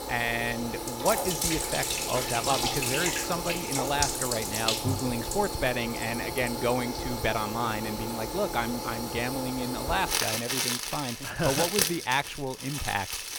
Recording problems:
household noises; very loud; throughout; 1 dB above the speech

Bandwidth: 17 kHz